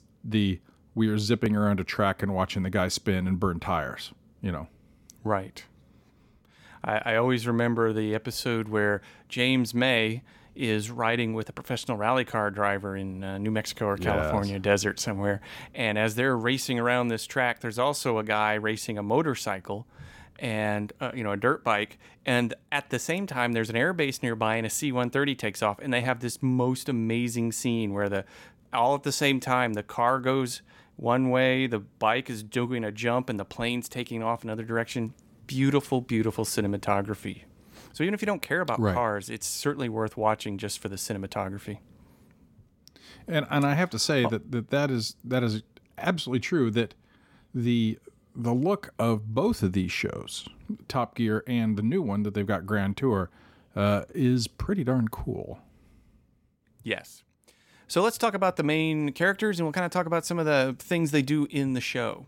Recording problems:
none

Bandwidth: 16.5 kHz